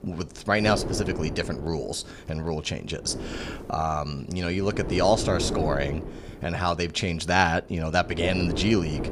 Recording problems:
wind noise on the microphone; occasional gusts; 10 dB below the speech

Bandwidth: 15 kHz